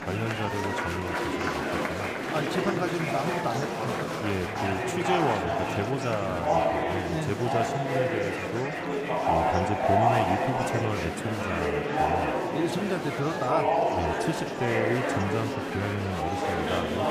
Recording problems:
murmuring crowd; very loud; throughout; 4 dB above the speech

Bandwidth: 15 kHz